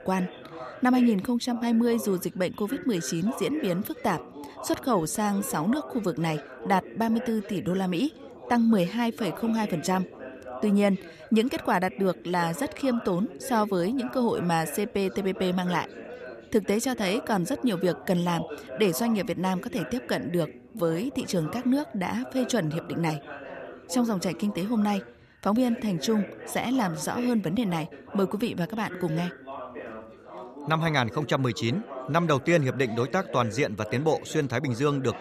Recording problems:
background chatter; noticeable; throughout; 3 voices, 15 dB below the speech

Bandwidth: 14.5 kHz